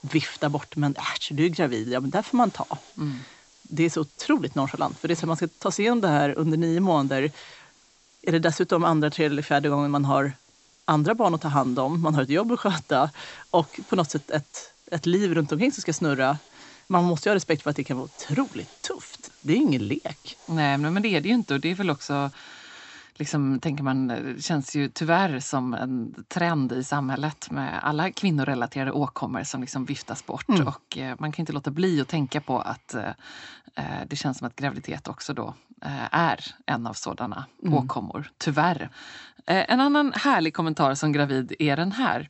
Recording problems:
high frequencies cut off; noticeable; nothing above 8 kHz
hiss; faint; until 22 s; 25 dB below the speech

